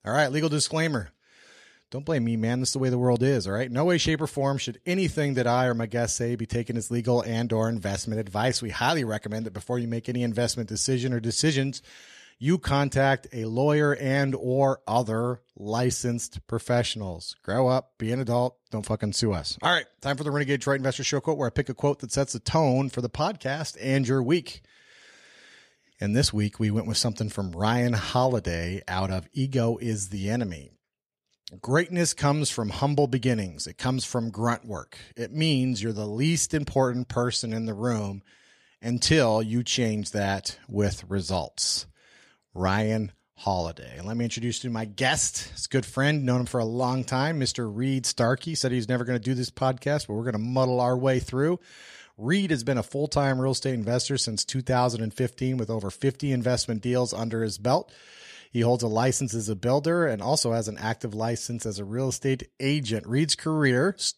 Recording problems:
none

